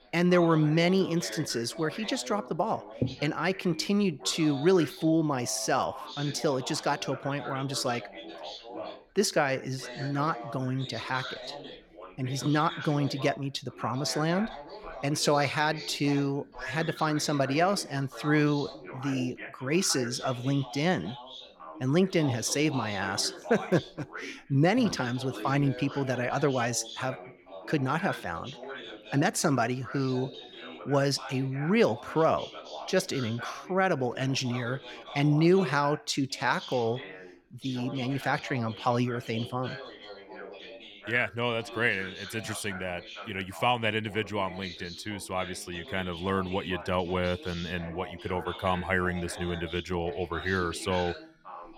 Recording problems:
background chatter; noticeable; throughout; 2 voices, 15 dB below the speech

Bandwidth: 17 kHz